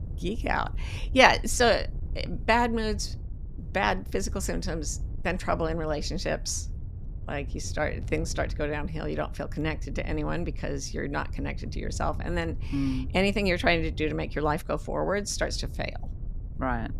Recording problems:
wind noise on the microphone; occasional gusts; 25 dB below the speech

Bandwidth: 14.5 kHz